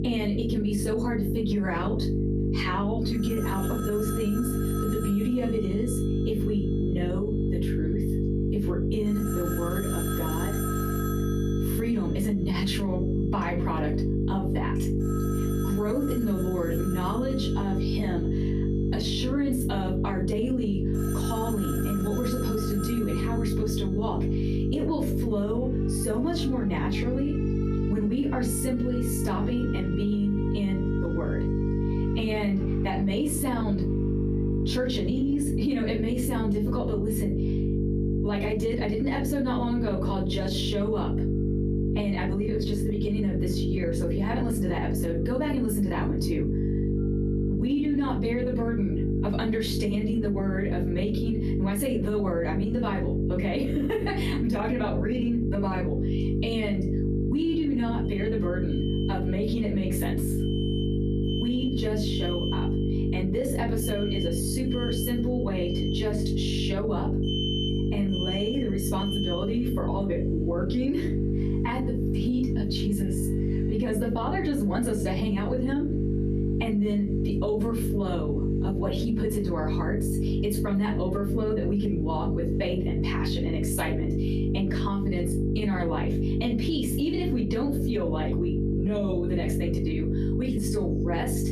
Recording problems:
off-mic speech; far
room echo; slight; dies away in 0.3 s
squashed, flat; somewhat
electrical hum; loud; throughout; 50 Hz, 3 dB below the speech
alarms or sirens; noticeable; throughout; 10 dB below the speech

